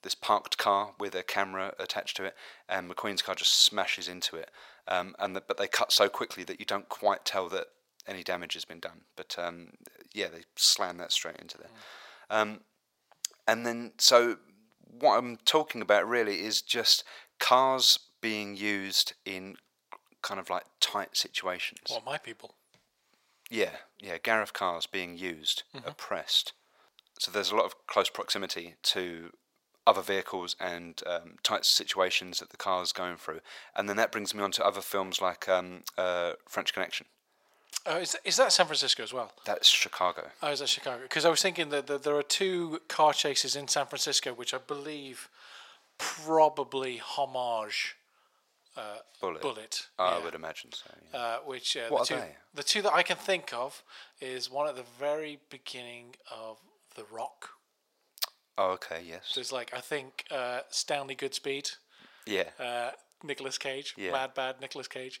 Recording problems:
thin; very; fading below 650 Hz

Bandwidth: 16 kHz